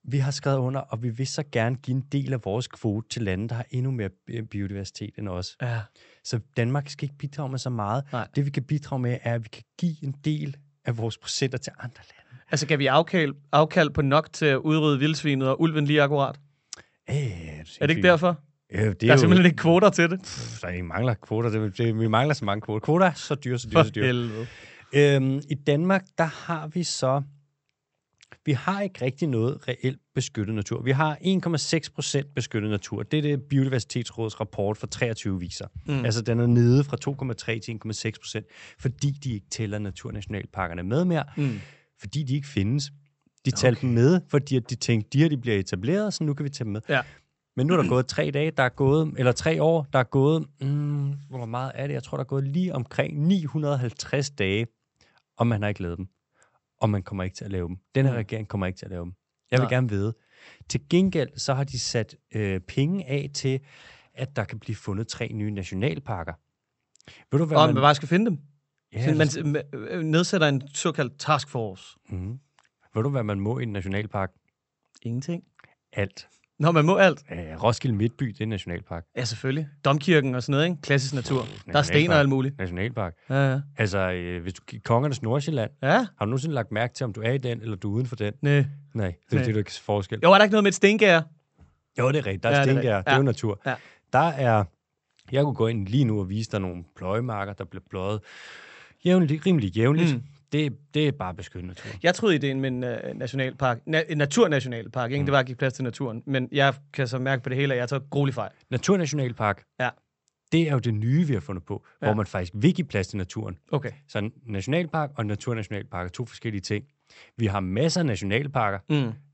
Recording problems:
high frequencies cut off; noticeable; nothing above 8 kHz

